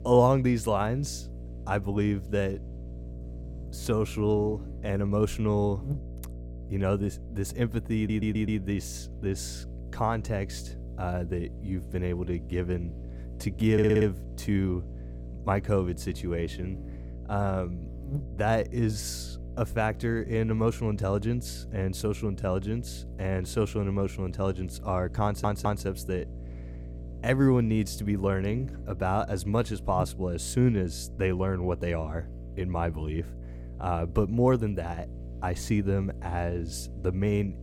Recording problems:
electrical hum; noticeable; throughout; 60 Hz, 20 dB below the speech
audio stuttering; at 8 s, at 14 s and at 25 s

